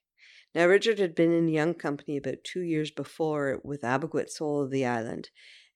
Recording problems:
none

